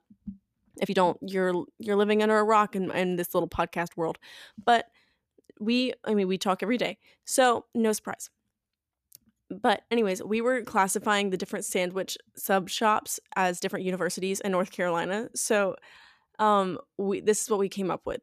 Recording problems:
uneven, jittery; strongly; from 0.5 to 17 s

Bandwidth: 14.5 kHz